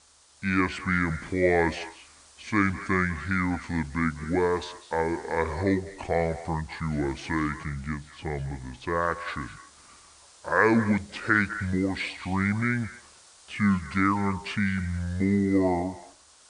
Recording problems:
wrong speed and pitch; too slow and too low; 0.6 times normal speed
echo of what is said; noticeable; throughout; 200 ms later, 15 dB below the speech
hiss; faint; throughout; 25 dB below the speech

